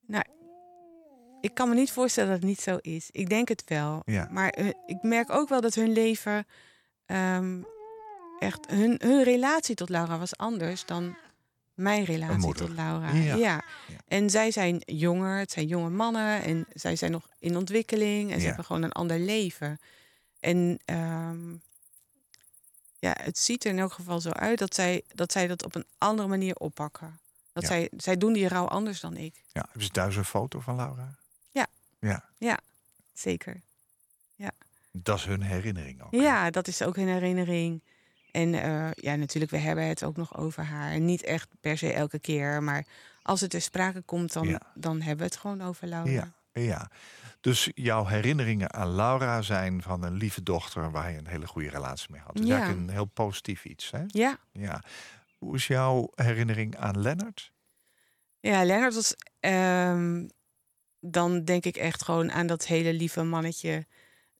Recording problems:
animal sounds; faint; throughout; 25 dB below the speech

